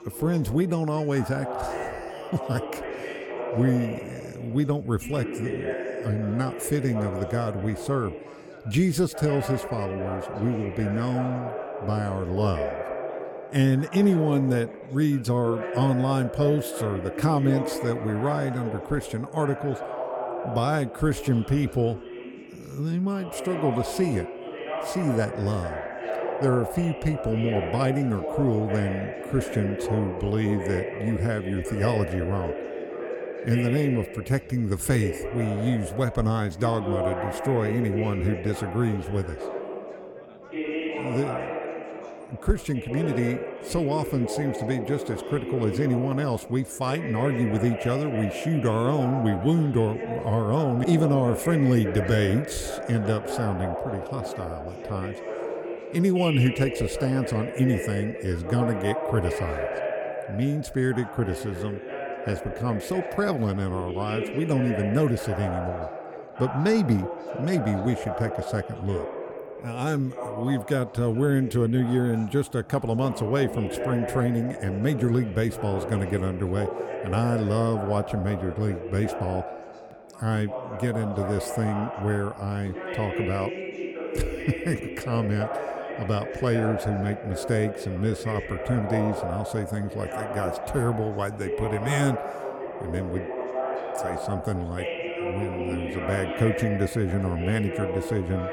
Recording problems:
background chatter; loud; throughout; 4 voices, 7 dB below the speech

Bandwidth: 17.5 kHz